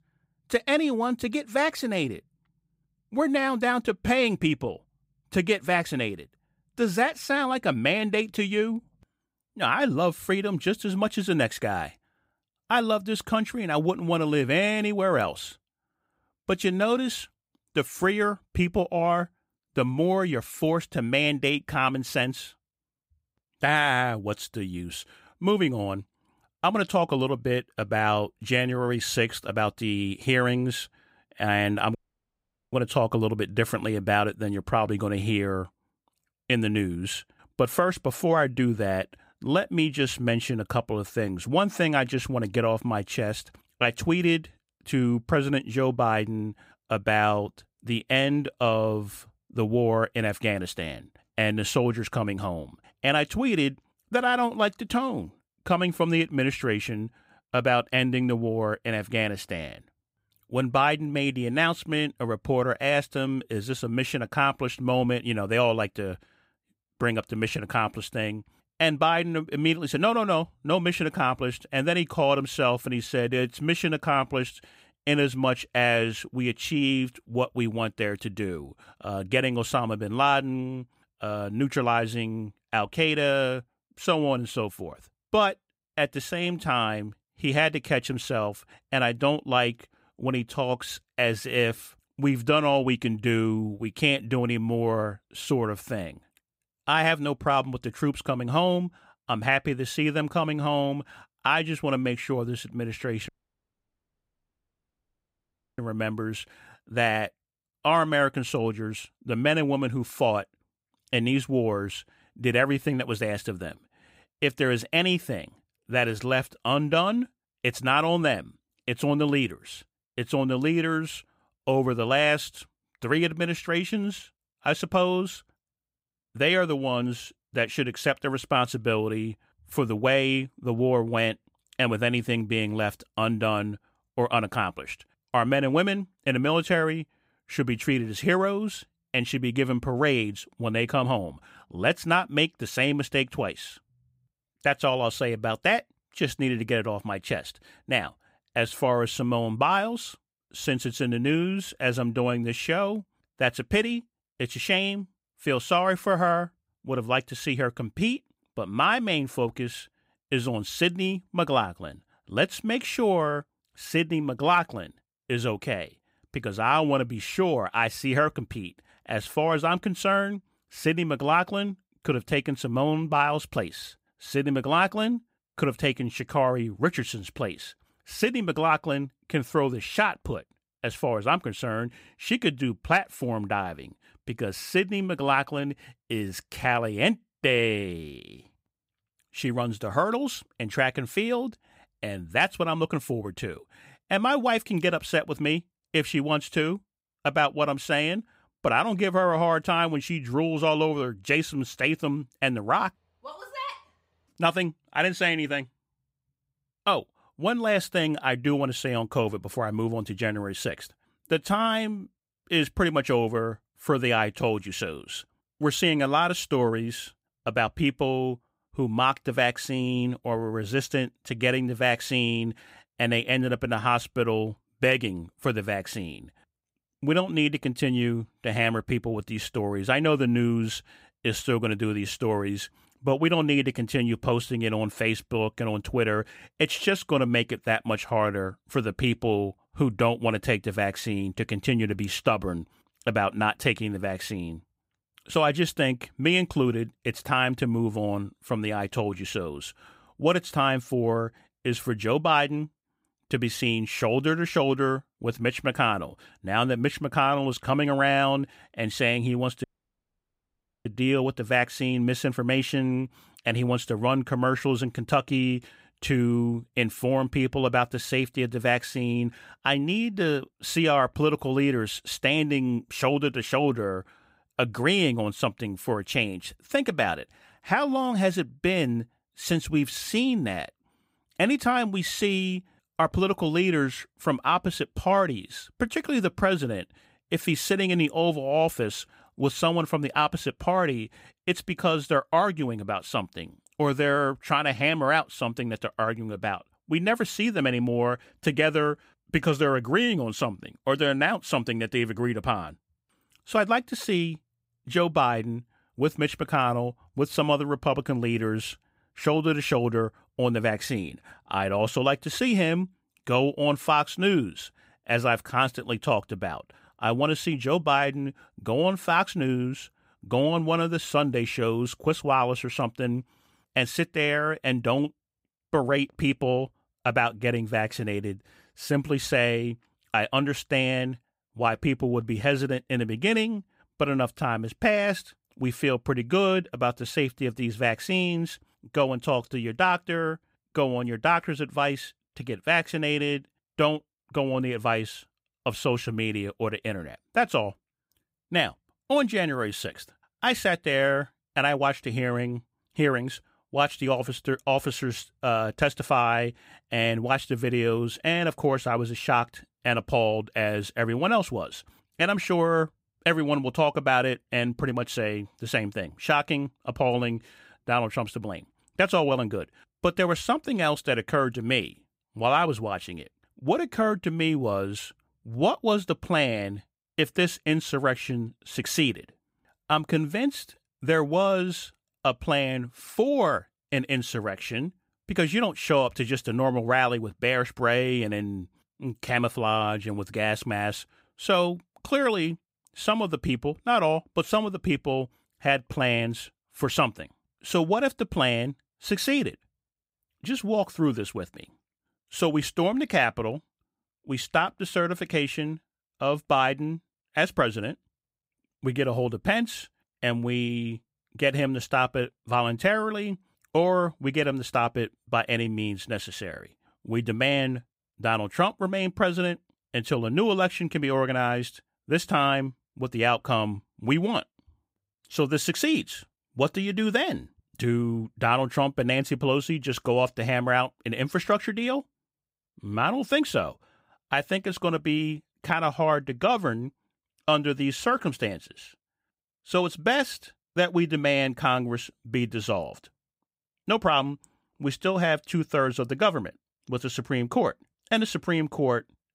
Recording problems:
audio cutting out; at 32 s for 1 s, at 1:43 for 2.5 s and at 4:20 for 1 s

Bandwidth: 15.5 kHz